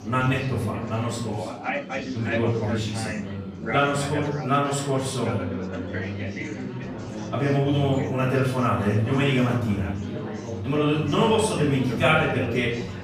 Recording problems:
off-mic speech; far
room echo; noticeable; dies away in 0.6 s
chatter from many people; loud; throughout; 7 dB below the speech
background music; faint; throughout; 25 dB below the speech

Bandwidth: 15 kHz